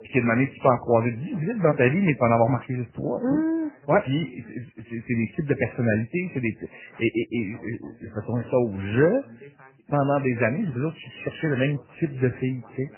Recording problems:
garbled, watery; badly; nothing above 3 kHz
voice in the background; faint; throughout; 25 dB below the speech

